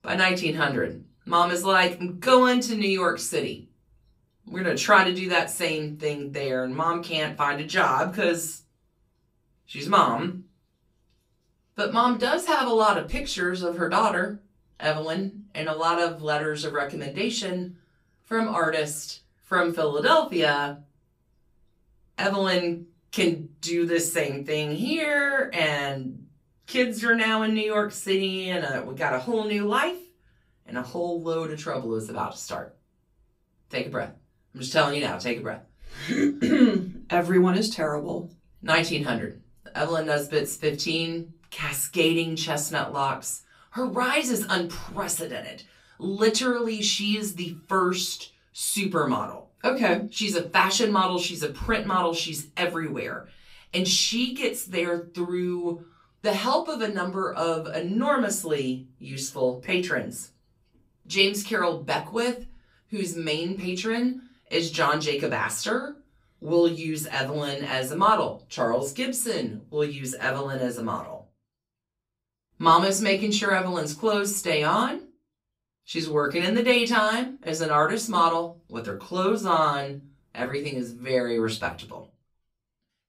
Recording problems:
off-mic speech; far
room echo; very slight; dies away in 0.3 s

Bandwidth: 15.5 kHz